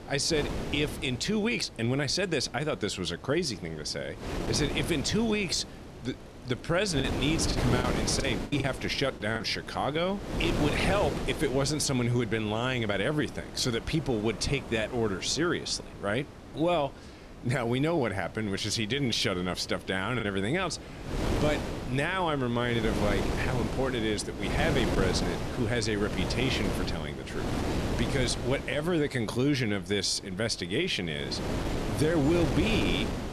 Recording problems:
wind noise on the microphone; heavy; 7 dB below the speech
traffic noise; faint; throughout; 25 dB below the speech
choppy; very; from 7 to 9.5 s and at 20 s; 10% of the speech affected

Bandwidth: 13.5 kHz